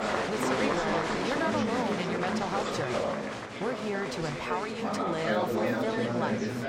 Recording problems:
chatter from many people; very loud; throughout; 4 dB above the speech

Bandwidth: 16 kHz